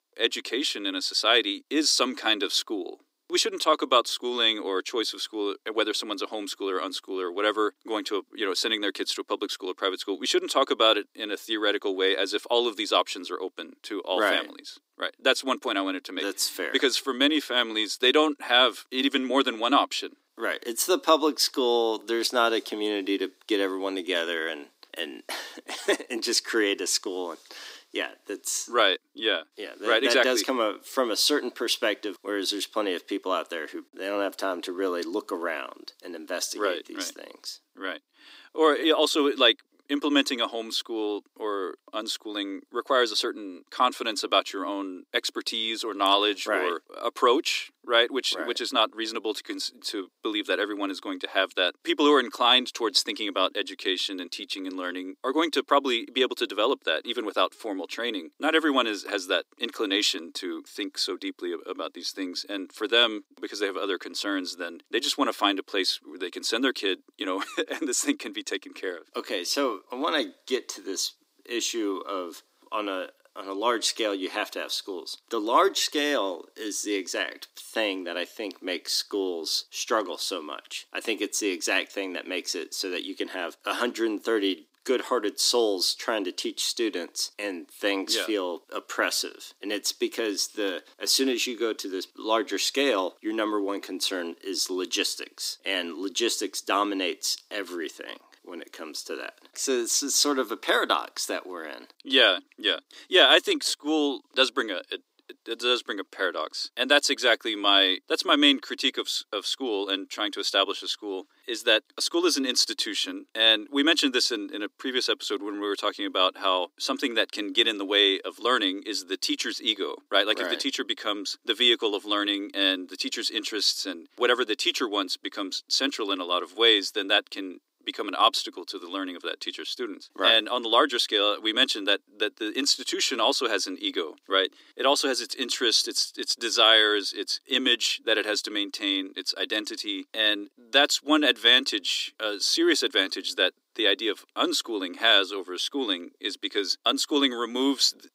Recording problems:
thin; somewhat; fading below 300 Hz

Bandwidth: 15.5 kHz